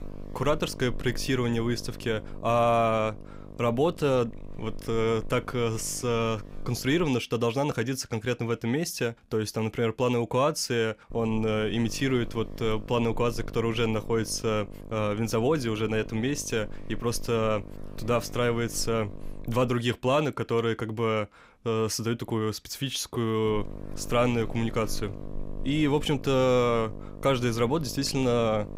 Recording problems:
electrical hum; noticeable; until 7 s, from 11 to 20 s and from 23 s on; 50 Hz, 20 dB below the speech

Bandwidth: 15.5 kHz